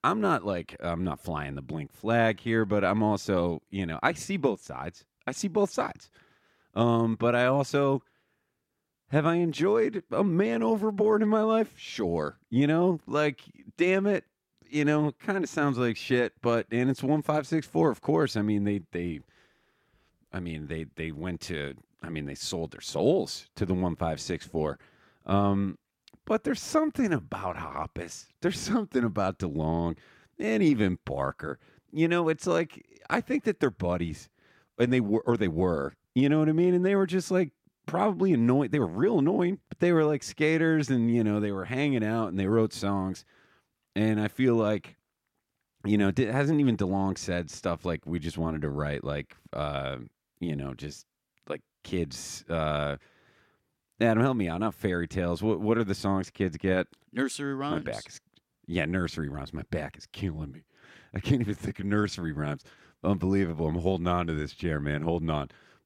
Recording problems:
none

